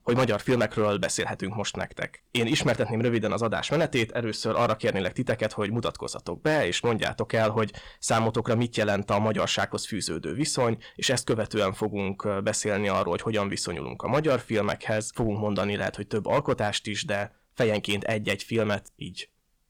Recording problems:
distortion; slight; 4% of the sound clipped

